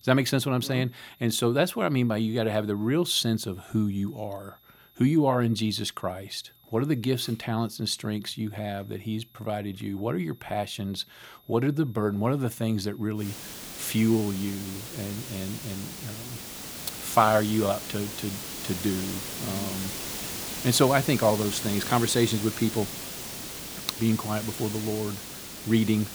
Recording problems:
hiss; loud; from 13 s on; 7 dB below the speech
high-pitched whine; faint; throughout; 11.5 kHz, 30 dB below the speech

